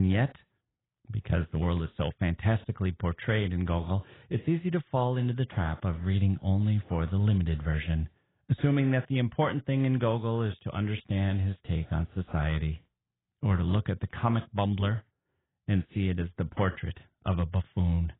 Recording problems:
garbled, watery; badly; nothing above 3.5 kHz
muffled; very slightly; fading above 3.5 kHz
abrupt cut into speech; at the start

